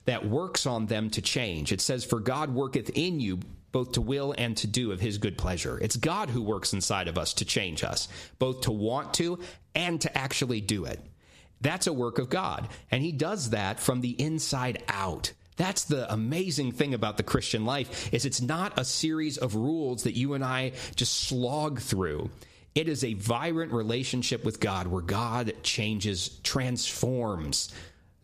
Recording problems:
squashed, flat; heavily

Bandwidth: 14.5 kHz